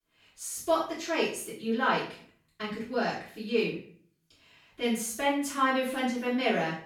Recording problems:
off-mic speech; far
room echo; noticeable; dies away in 0.4 s

